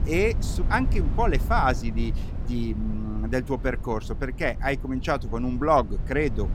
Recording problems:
low rumble; noticeable; throughout; 20 dB below the speech

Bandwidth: 16.5 kHz